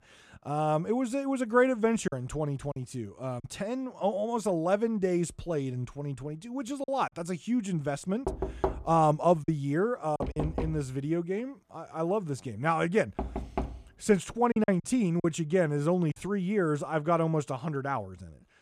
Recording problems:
choppy; very; from 2 to 3.5 s, from 7 to 10 s and from 15 to 16 s; 6% of the speech affected
door banging; noticeable; from 8.5 to 14 s; peak 3 dB below the speech

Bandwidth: 14.5 kHz